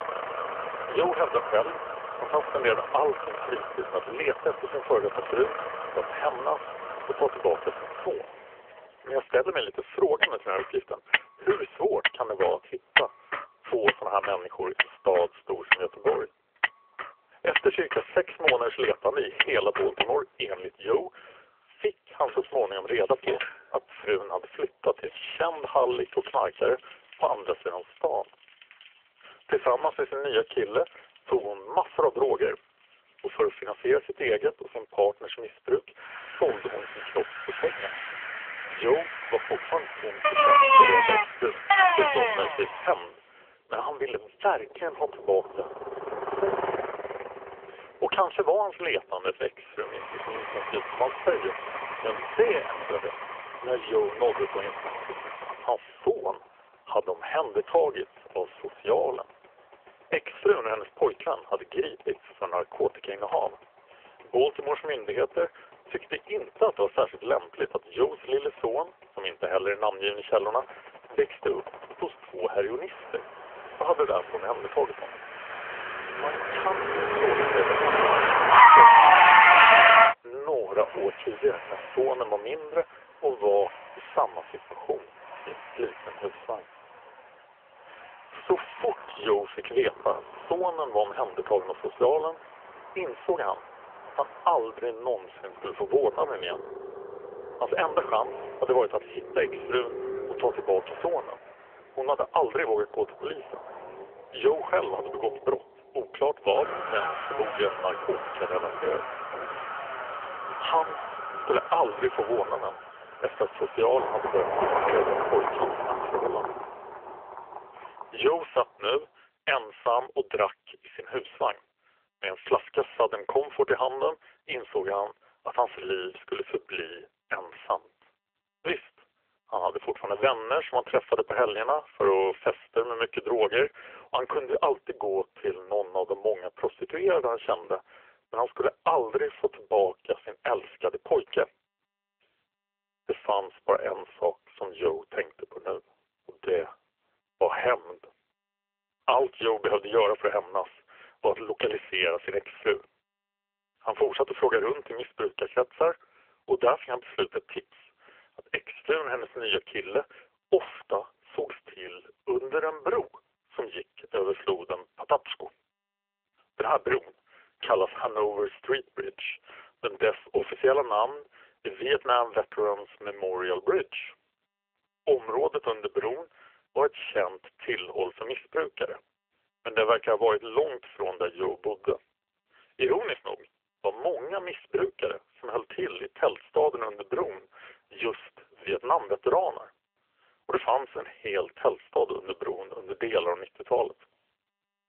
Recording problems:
phone-call audio; poor line; nothing above 3 kHz
traffic noise; very loud; until 1:59; 4 dB above the speech

